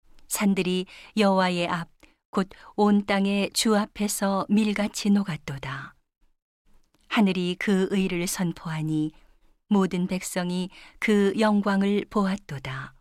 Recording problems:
none

